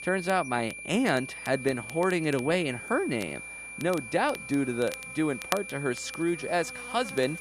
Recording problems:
high-pitched whine; loud; throughout; 2.5 kHz, 10 dB below the speech
crackle, like an old record; noticeable; 15 dB below the speech
electrical hum; faint; throughout; 60 Hz, 20 dB below the speech

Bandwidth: 14.5 kHz